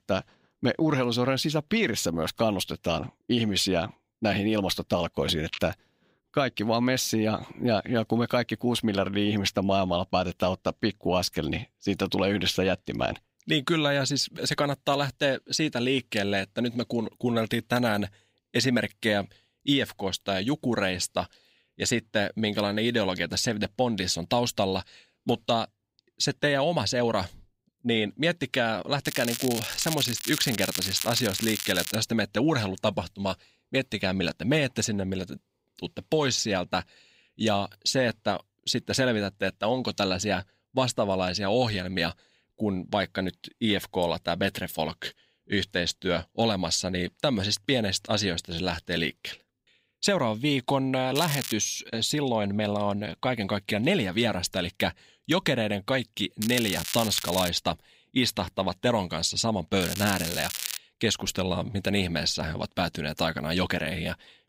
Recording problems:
crackling; loud; 4 times, first at 29 s; 5 dB below the speech

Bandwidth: 15.5 kHz